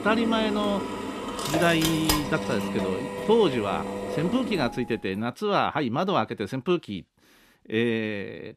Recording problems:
machinery noise; loud; until 4.5 s; 4 dB below the speech

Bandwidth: 14.5 kHz